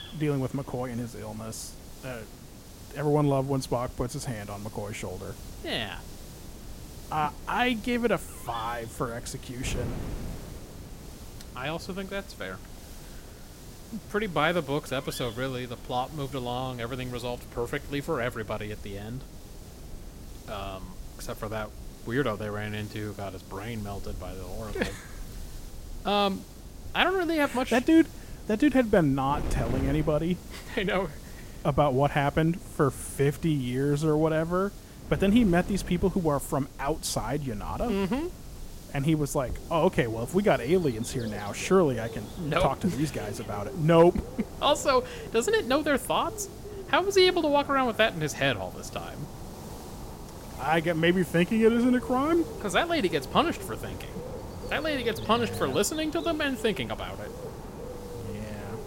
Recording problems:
animal sounds; noticeable; throughout; 15 dB below the speech
wind noise on the microphone; occasional gusts; 25 dB below the speech
hiss; faint; throughout; 25 dB below the speech

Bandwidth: 16 kHz